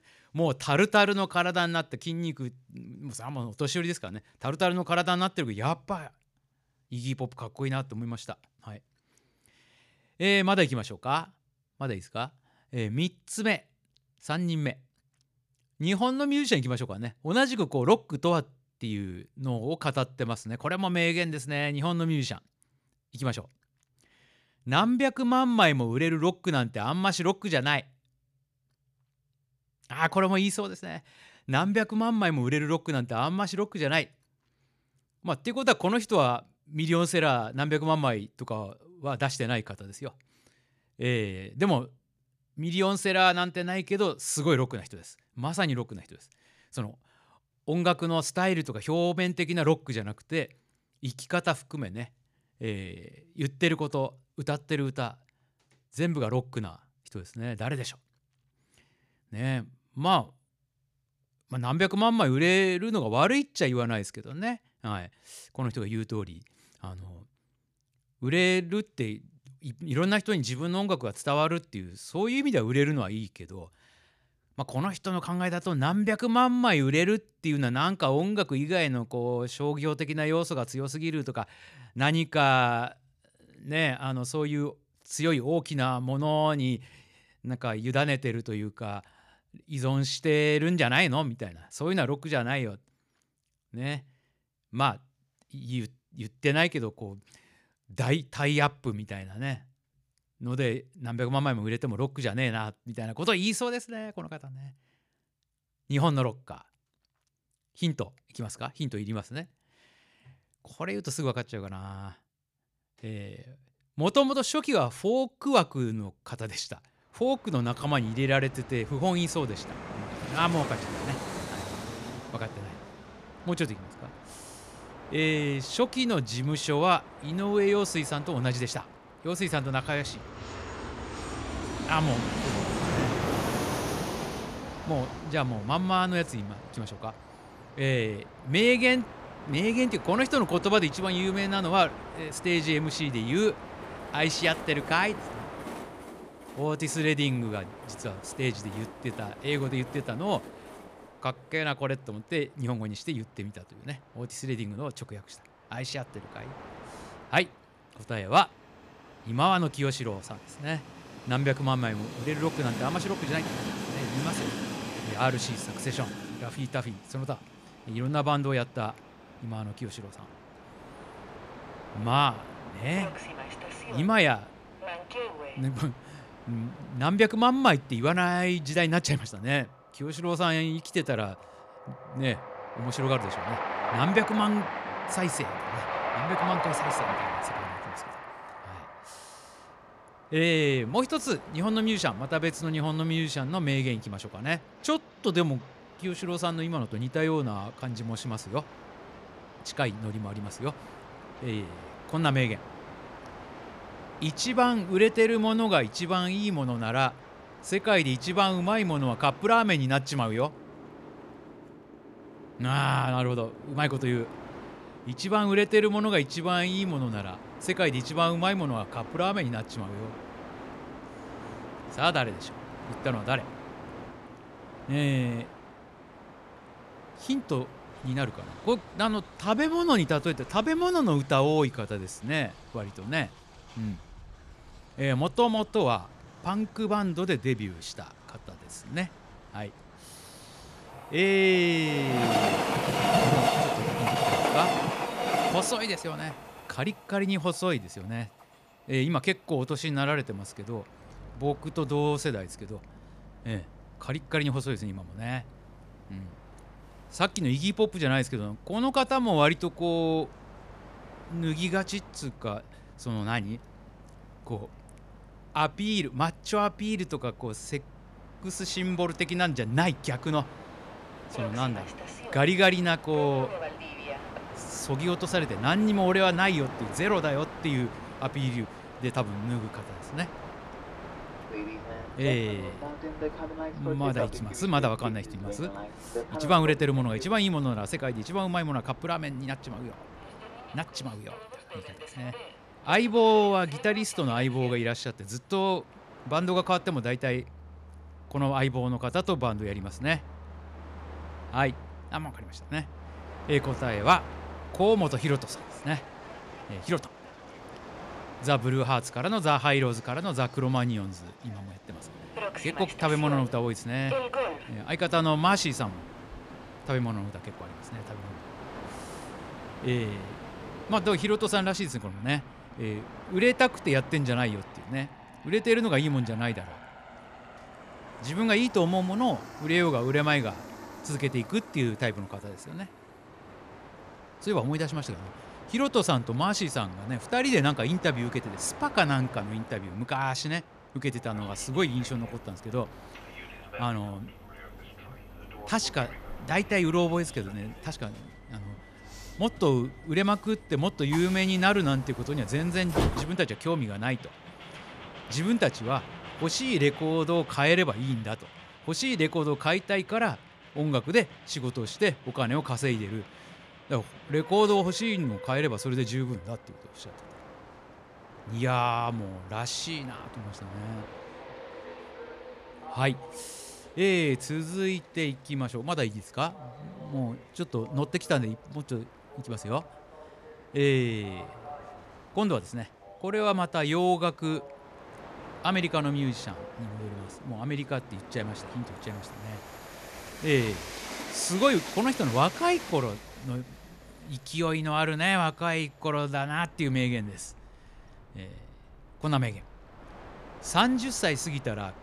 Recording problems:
train or aircraft noise; noticeable; from 1:58 on; 10 dB below the speech

